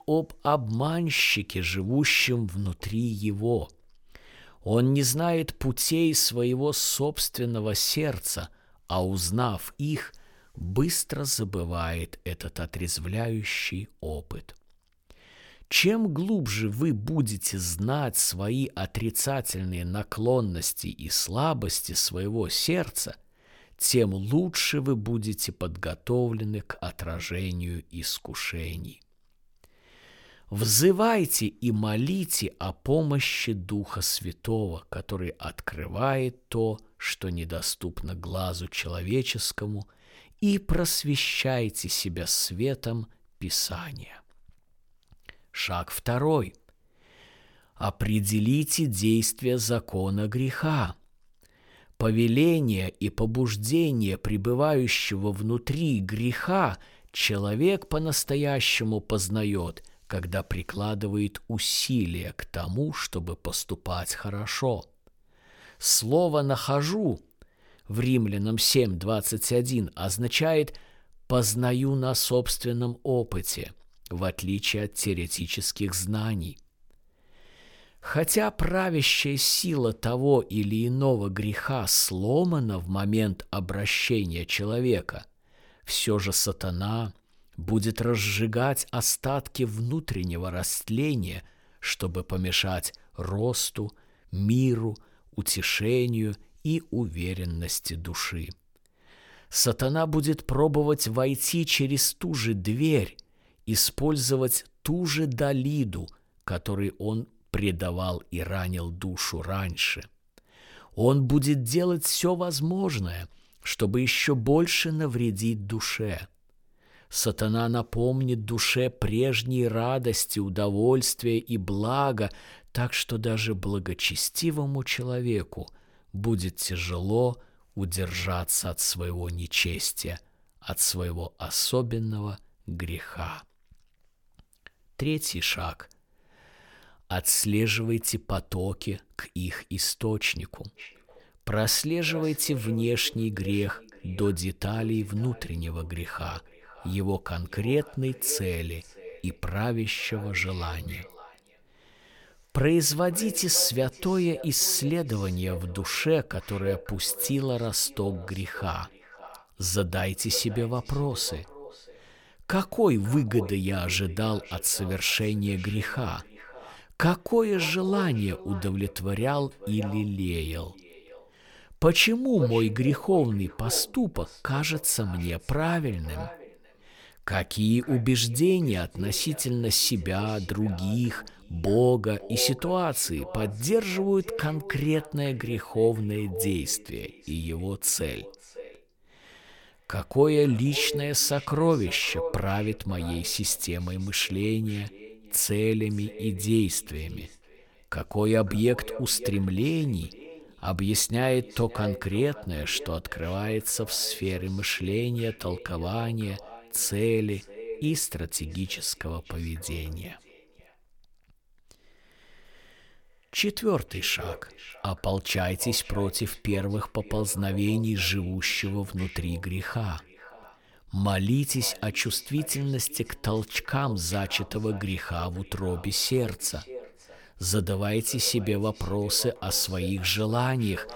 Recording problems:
echo of what is said; noticeable; from 2:21 on; 550 ms later, 15 dB below the speech

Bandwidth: 17.5 kHz